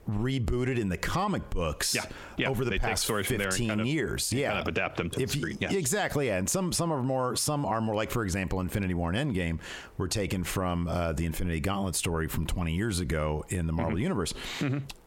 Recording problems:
squashed, flat; heavily

